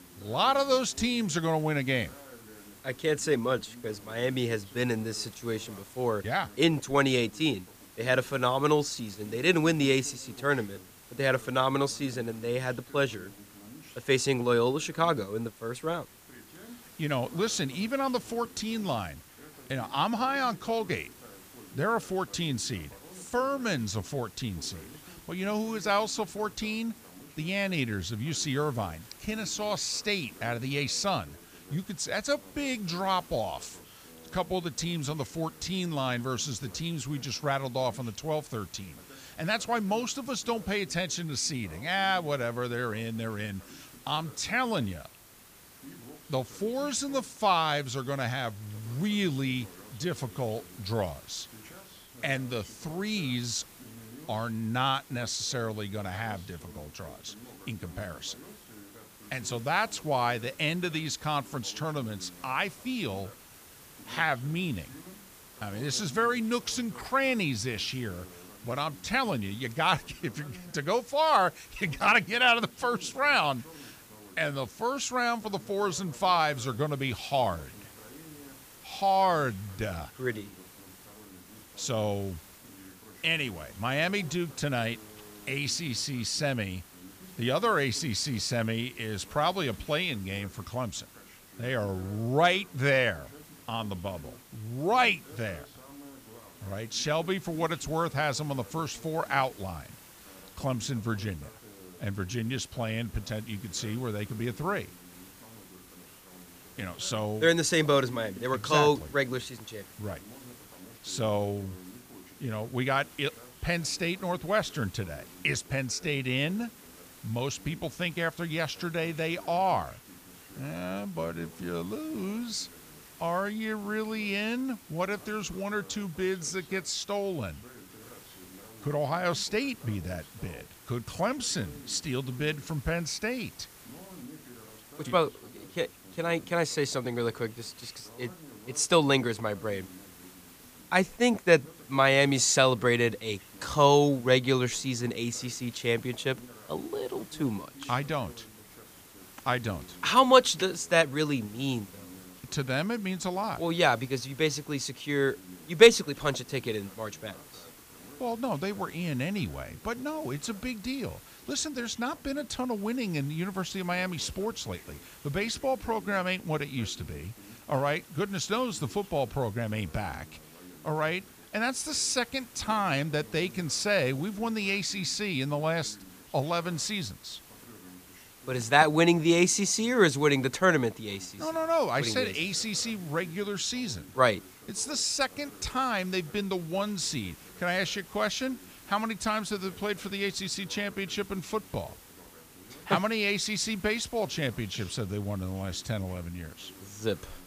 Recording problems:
voice in the background; faint; throughout; 25 dB below the speech
hiss; faint; throughout; 20 dB below the speech

